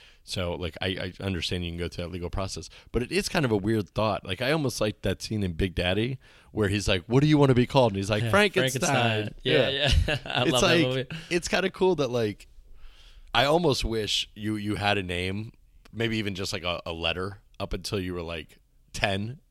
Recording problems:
none

